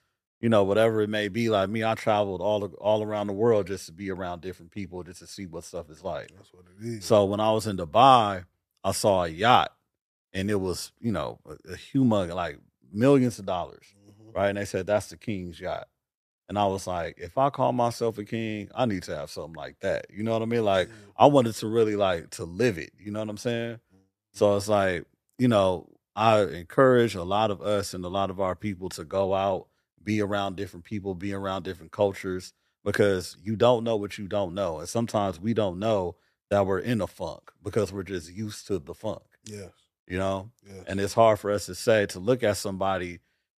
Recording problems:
none

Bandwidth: 14.5 kHz